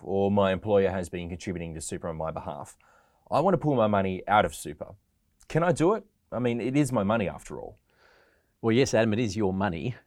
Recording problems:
none

